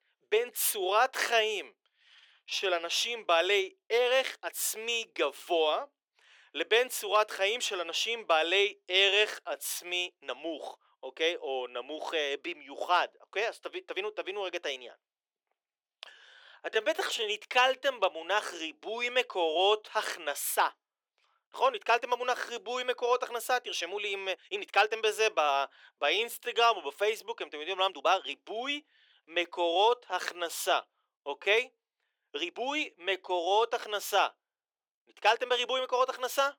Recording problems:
thin; very; fading below 400 Hz
uneven, jittery; strongly; from 2.5 to 36 s

